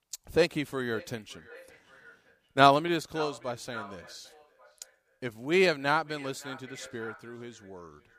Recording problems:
echo of what is said; faint; throughout; 570 ms later, 20 dB below the speech

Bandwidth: 15 kHz